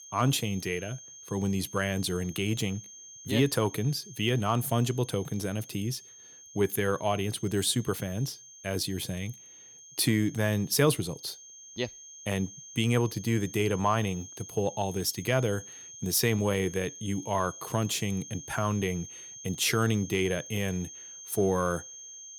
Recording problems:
high-pitched whine; noticeable; throughout; 6.5 kHz, 15 dB below the speech

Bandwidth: 18.5 kHz